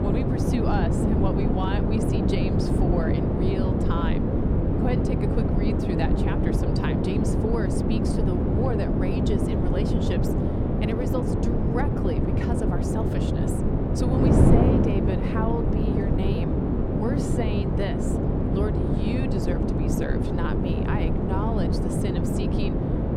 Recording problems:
wind noise on the microphone; heavy; 4 dB above the speech

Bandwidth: 18 kHz